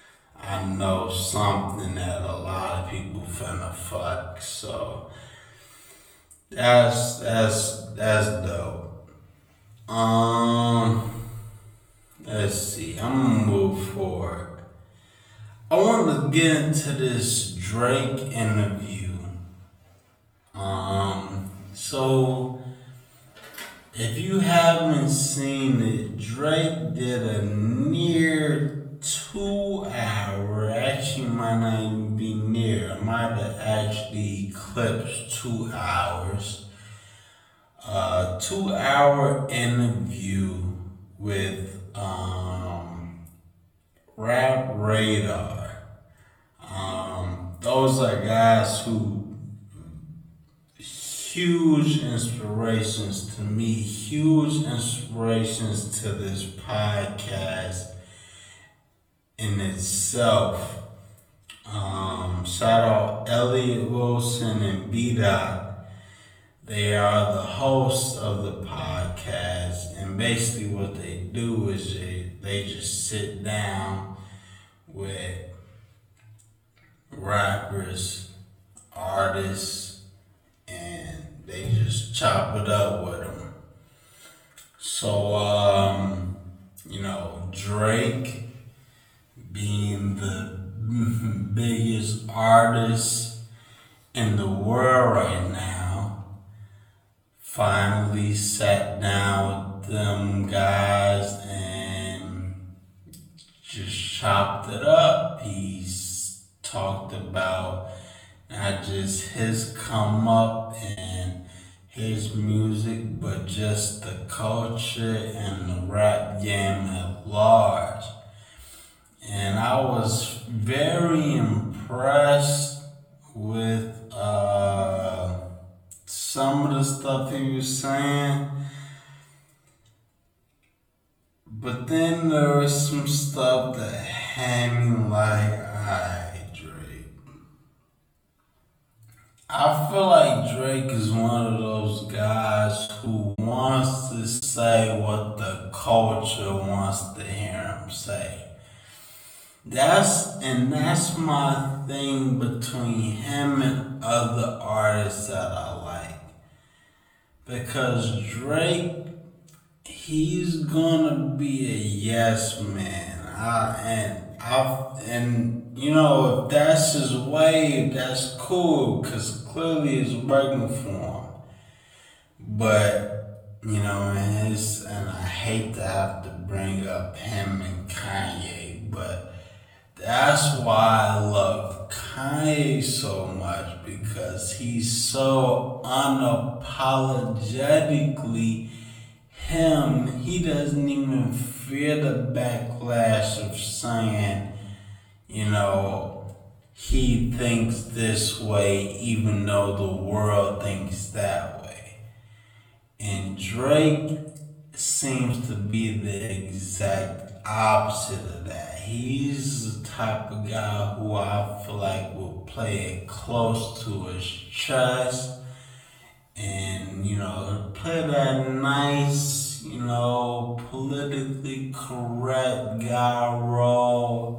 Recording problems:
off-mic speech; far
wrong speed, natural pitch; too slow; 0.5 times normal speed
room echo; slight; dies away in 0.8 s
choppy; very; at 1:51, from 2:23 to 2:24 and from 3:25 to 3:27; 15% of the speech affected

